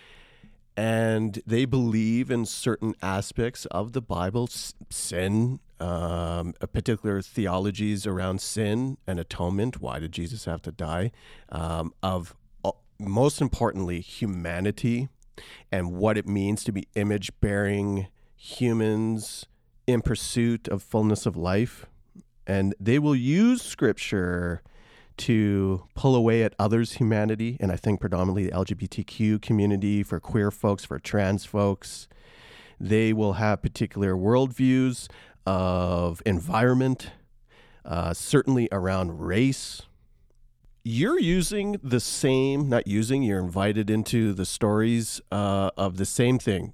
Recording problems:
none

